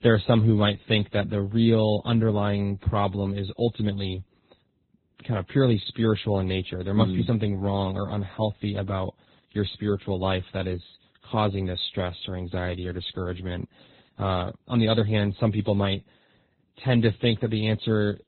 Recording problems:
garbled, watery; badly; nothing above 4 kHz

